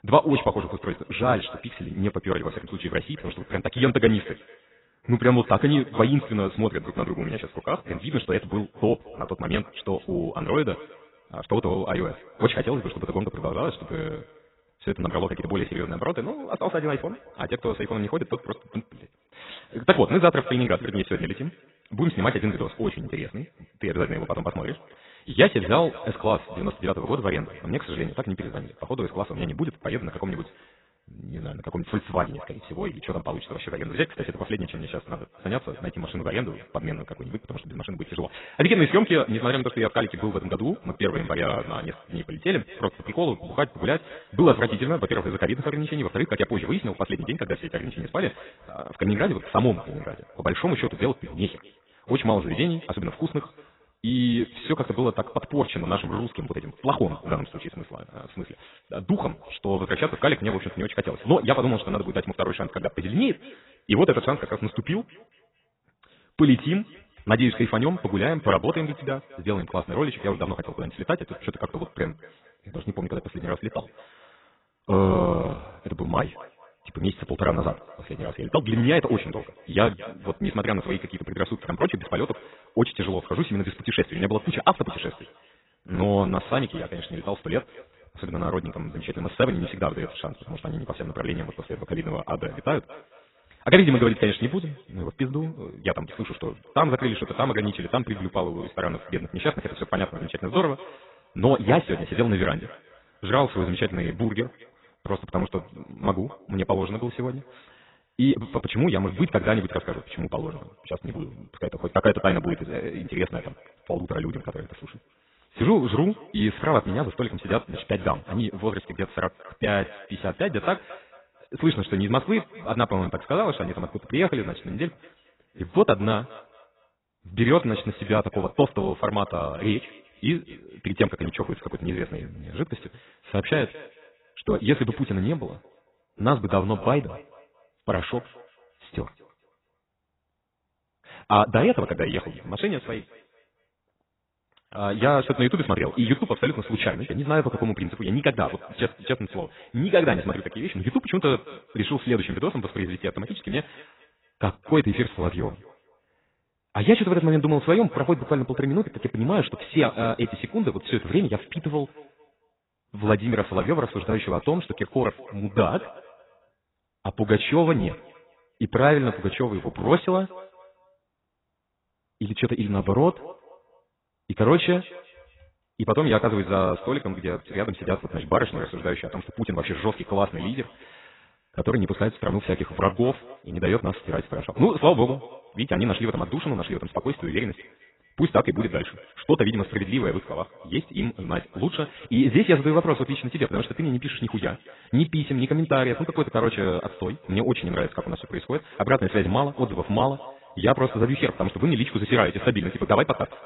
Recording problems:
garbled, watery; badly; nothing above 4 kHz
wrong speed, natural pitch; too fast; 1.5 times normal speed
echo of what is said; faint; throughout; 220 ms later, 20 dB below the speech

